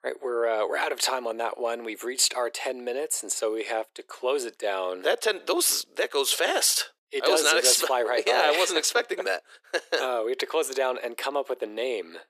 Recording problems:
thin; very; fading below 350 Hz

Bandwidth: 14.5 kHz